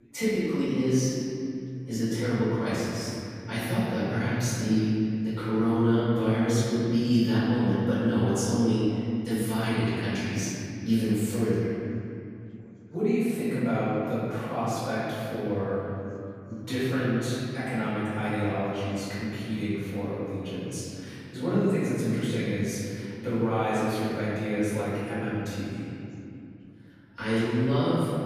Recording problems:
room echo; strong; dies away in 2.6 s
off-mic speech; far
background chatter; faint; throughout; 4 voices, 30 dB below the speech

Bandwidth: 15 kHz